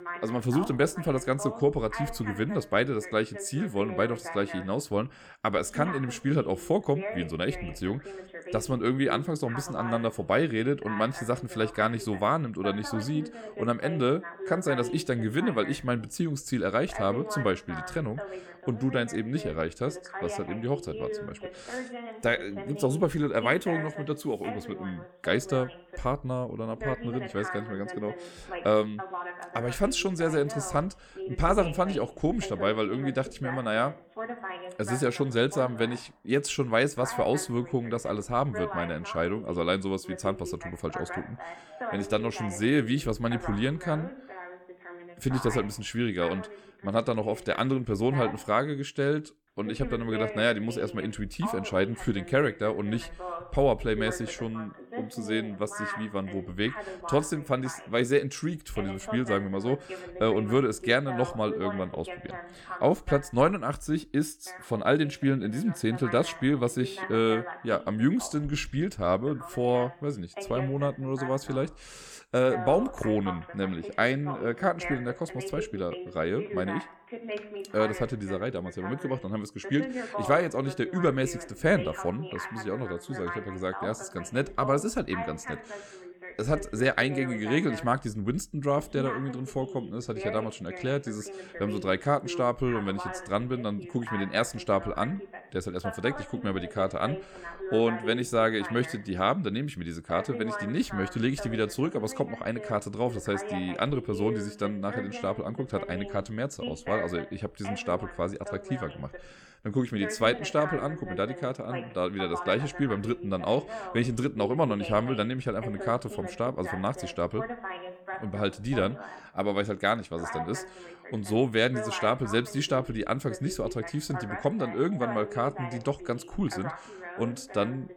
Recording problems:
voice in the background; noticeable; throughout; 10 dB below the speech

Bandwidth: 17.5 kHz